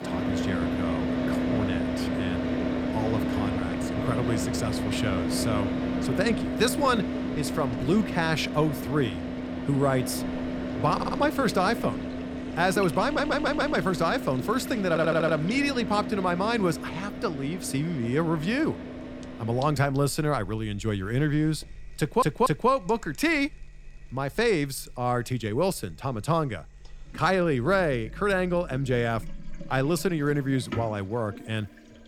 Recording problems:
traffic noise; loud; throughout; 4 dB below the speech
household noises; noticeable; throughout; 20 dB below the speech
audio stuttering; 4 times, first at 11 s

